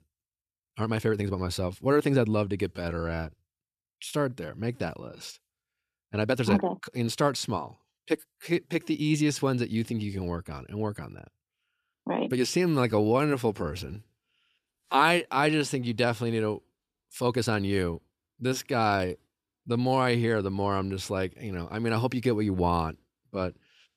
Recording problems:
uneven, jittery; strongly; from 0.5 to 20 s

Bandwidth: 14.5 kHz